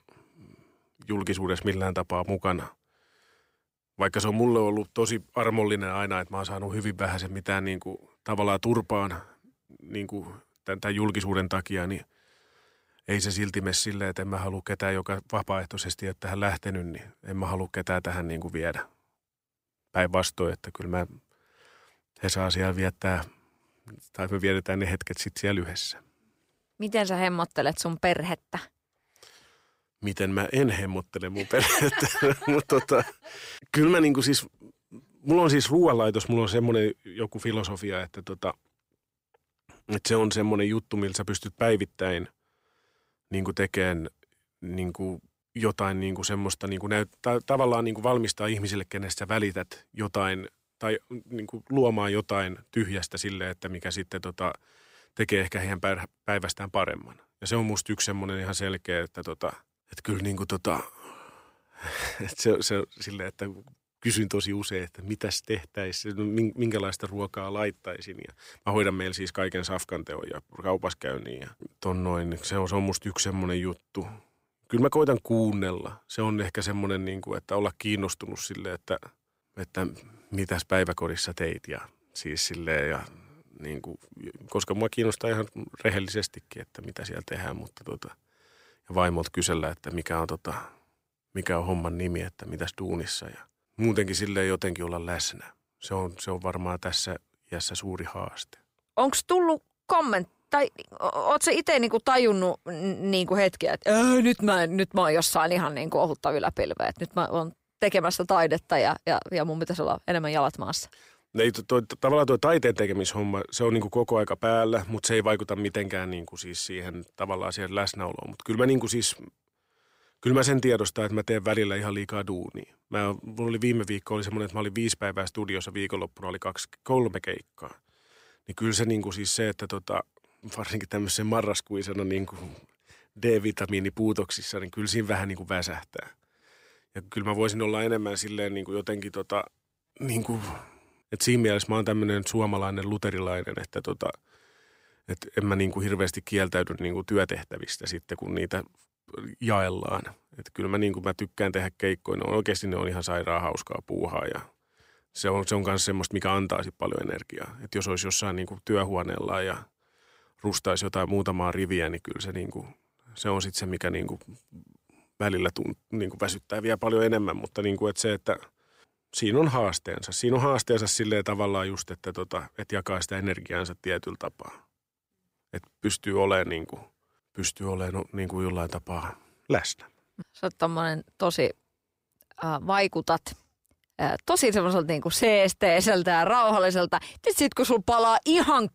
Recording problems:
none

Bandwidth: 15.5 kHz